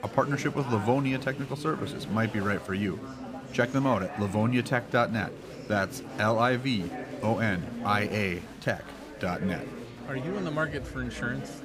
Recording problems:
chatter from many people; noticeable; throughout; 10 dB below the speech

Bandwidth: 15 kHz